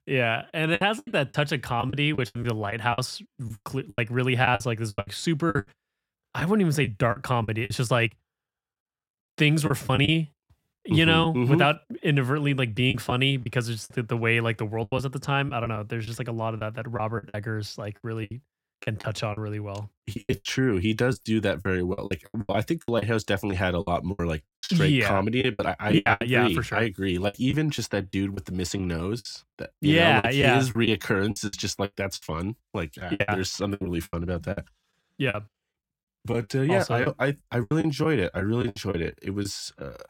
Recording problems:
choppy; very; 12% of the speech affected

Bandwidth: 16.5 kHz